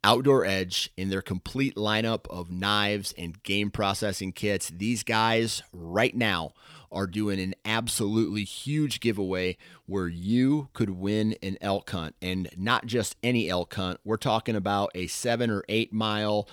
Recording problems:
none

